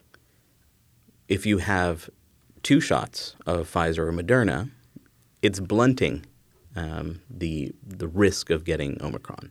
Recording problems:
none

